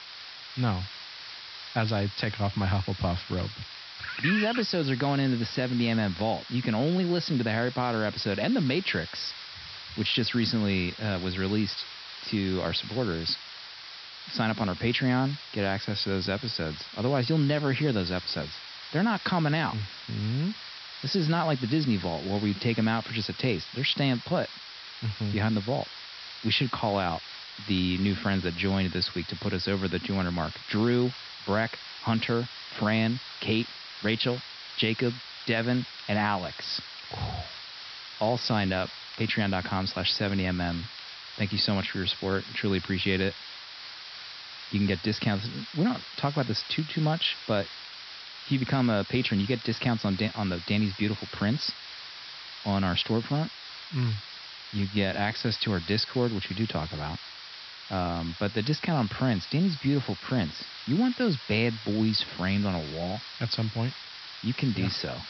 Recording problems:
high frequencies cut off; noticeable; nothing above 5.5 kHz
hiss; noticeable; throughout; 10 dB below the speech
crackle, like an old record; faint; 25 dB below the speech

